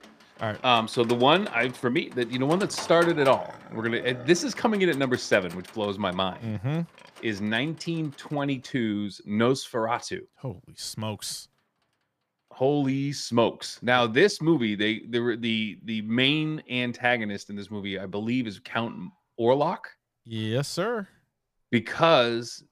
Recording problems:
animal sounds; noticeable; throughout; 20 dB below the speech

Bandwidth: 15 kHz